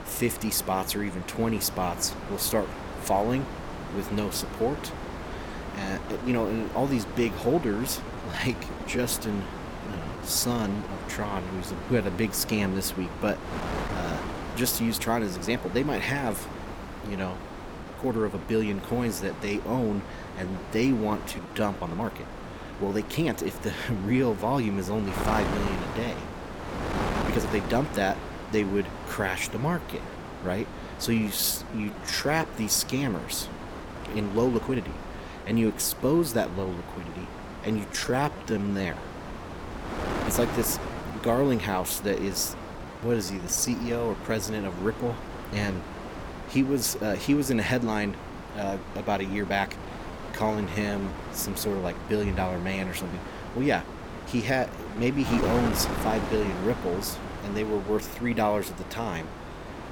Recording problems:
wind noise on the microphone; heavy; 7 dB below the speech
uneven, jittery; strongly; from 6 to 56 s

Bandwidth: 17.5 kHz